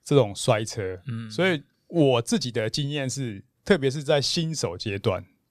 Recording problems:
none

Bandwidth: 15 kHz